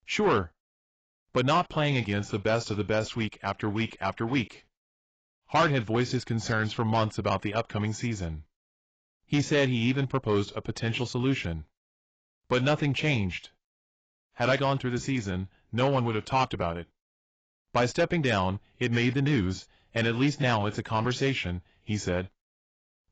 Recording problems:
garbled, watery; badly; nothing above 7.5 kHz
distortion; slight; 10 dB below the speech

